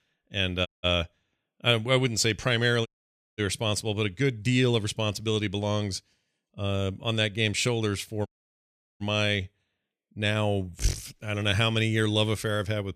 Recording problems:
audio cutting out; at 0.5 s, at 3 s for 0.5 s and at 8.5 s for 0.5 s

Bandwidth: 14.5 kHz